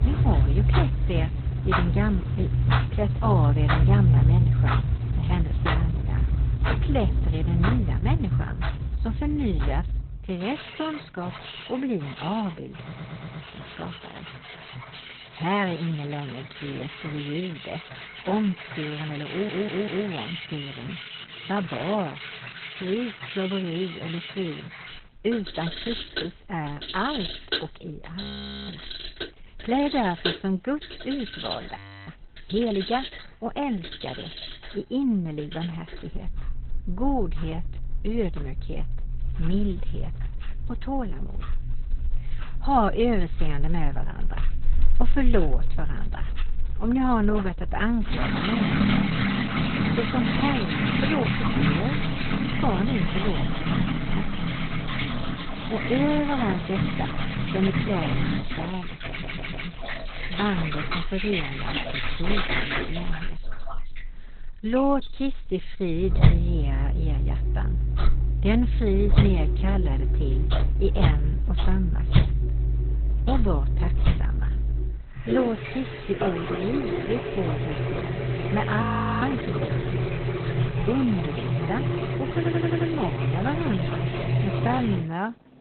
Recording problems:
garbled, watery; badly; nothing above 4 kHz
household noises; very loud; throughout; 2 dB above the speech
audio stuttering; 4 times, first at 13 s
audio freezing; at 28 s, at 32 s and at 1:19

